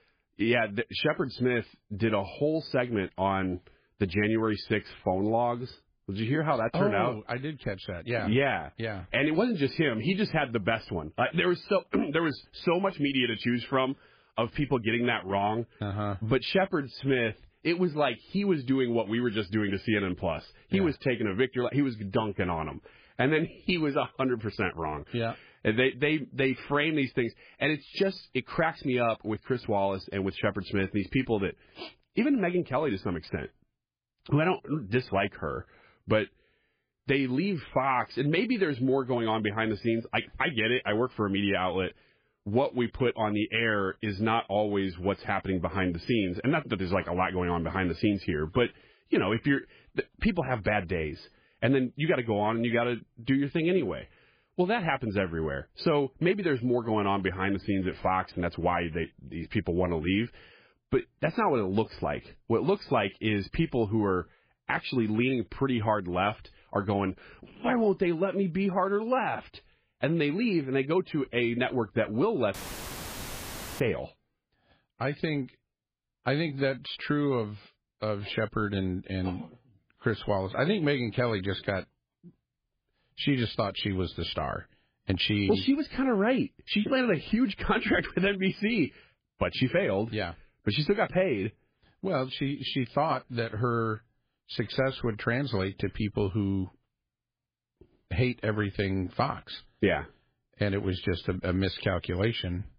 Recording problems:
garbled, watery; badly; nothing above 5 kHz
audio cutting out; filled with static; at 1:13 for 1.5 s

